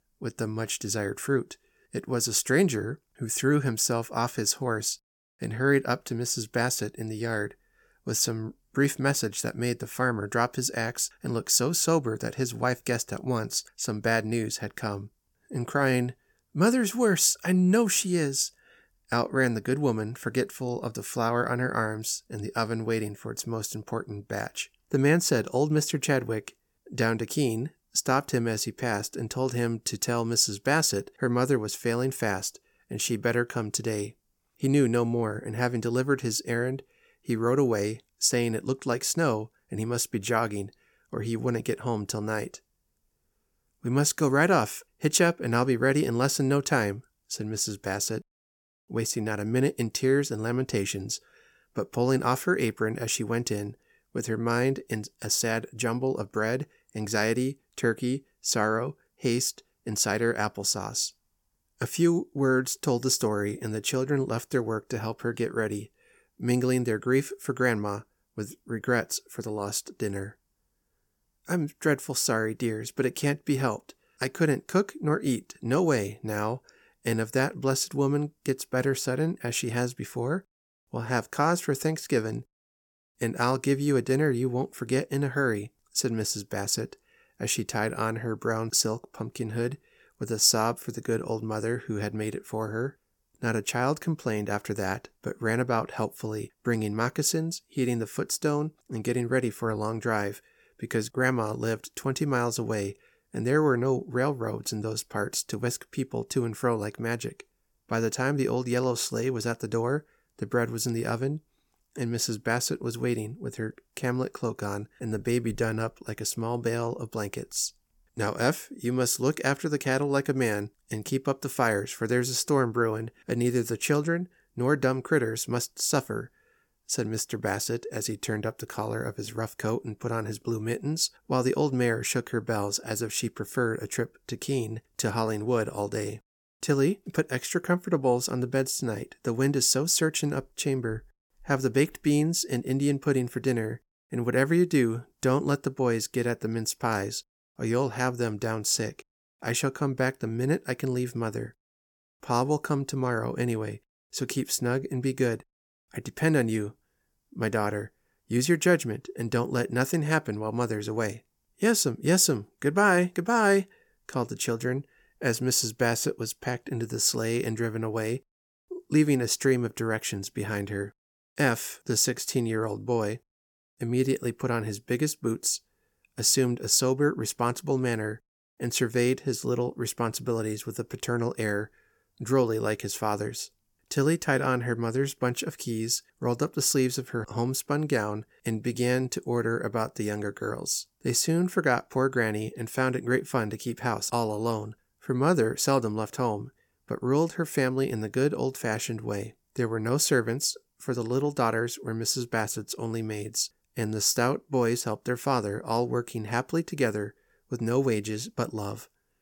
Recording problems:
none

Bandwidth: 17 kHz